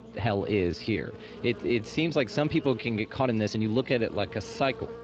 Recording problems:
muffled; slightly; fading above 3.5 kHz
garbled, watery; slightly
electrical hum; noticeable; throughout; 60 Hz, 15 dB below the speech
uneven, jittery; strongly

